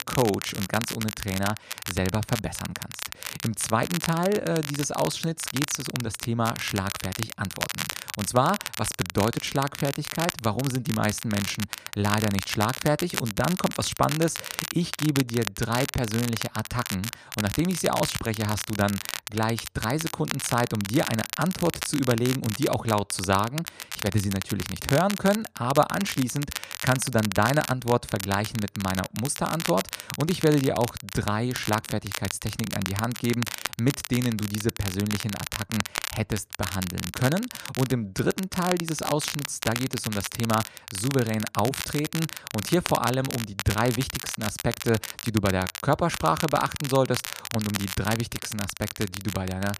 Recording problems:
crackle, like an old record; loud; 6 dB below the speech

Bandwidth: 14.5 kHz